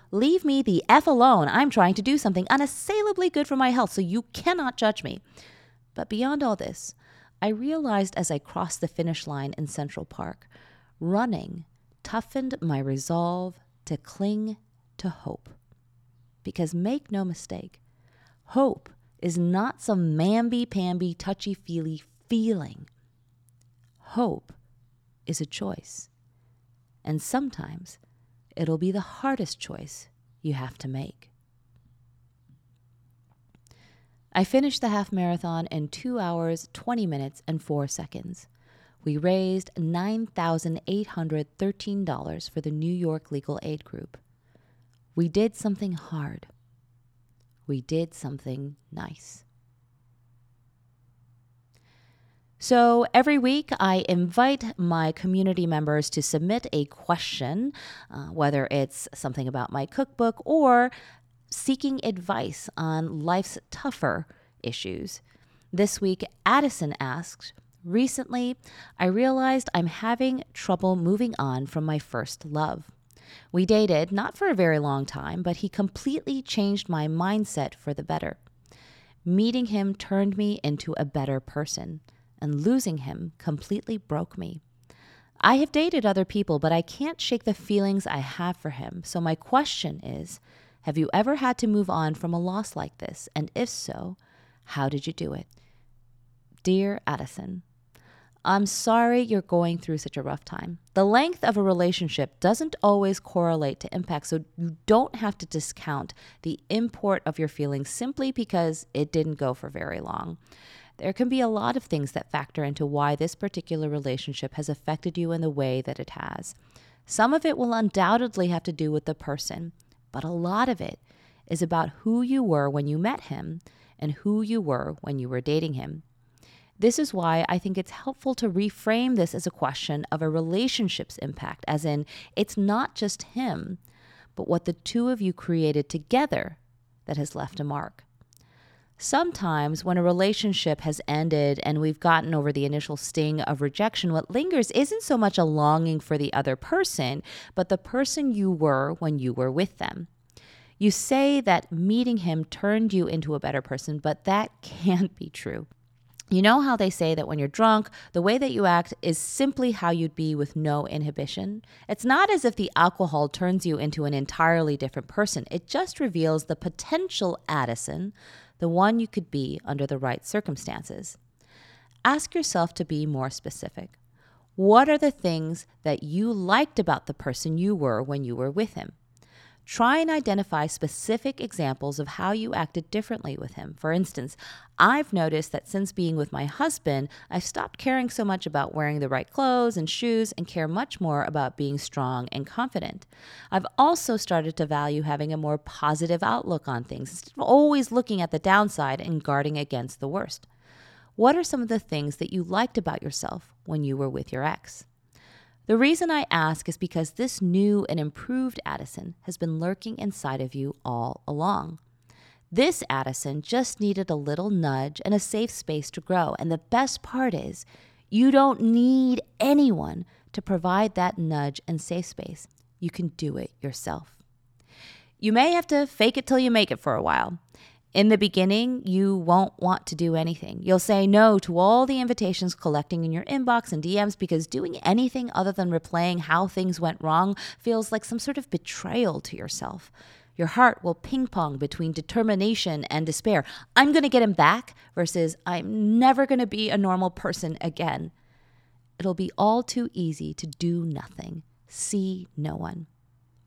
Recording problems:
none

